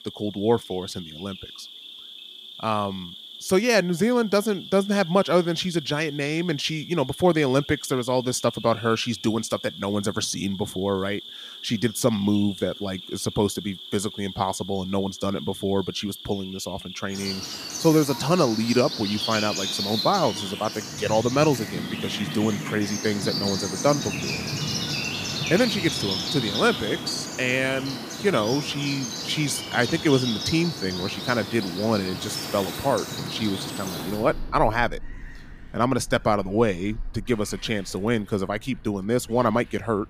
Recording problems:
animal sounds; loud; throughout; 7 dB below the speech

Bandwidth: 15 kHz